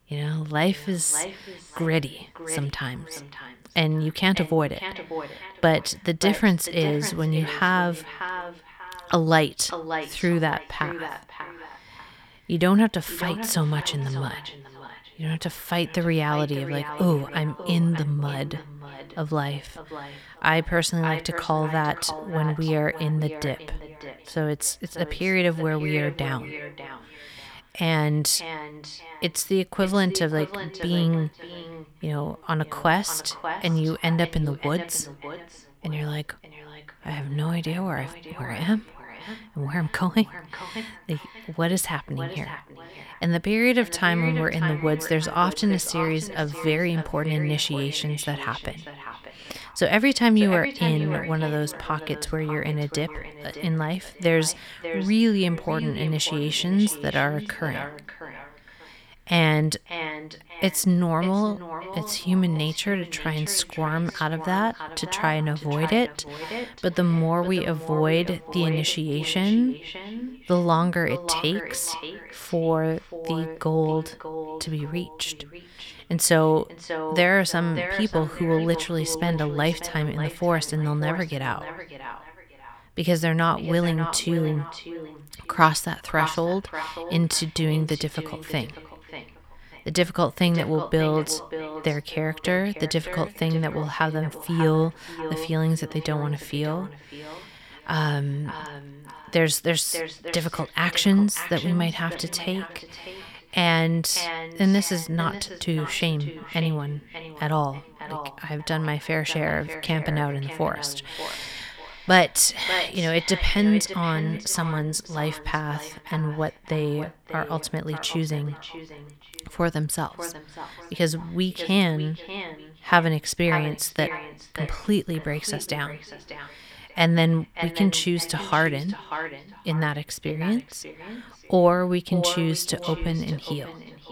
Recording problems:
echo of what is said; strong; throughout; 590 ms later, 10 dB below the speech

